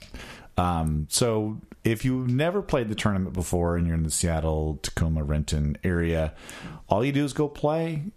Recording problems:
squashed, flat; somewhat

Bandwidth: 14.5 kHz